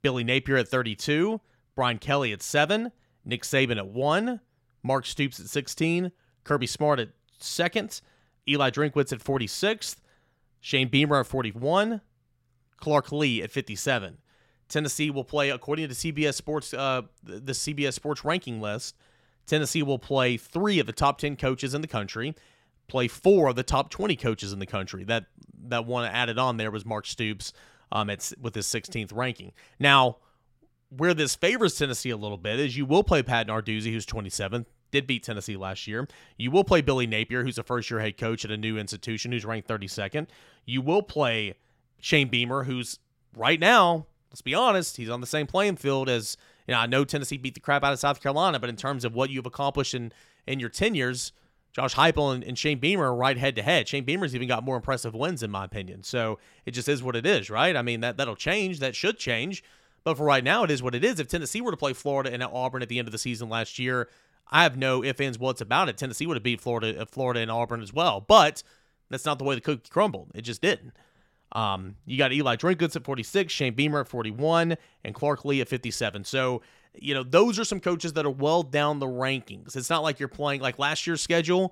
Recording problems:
none

